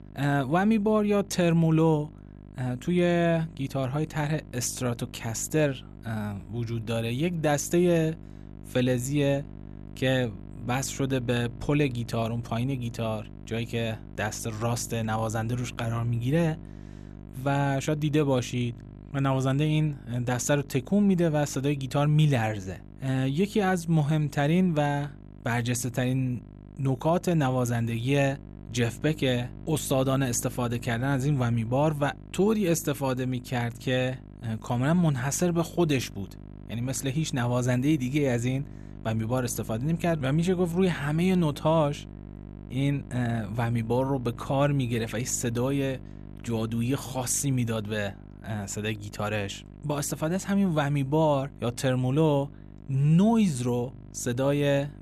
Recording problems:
electrical hum; faint; throughout; 50 Hz, 25 dB below the speech

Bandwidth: 13.5 kHz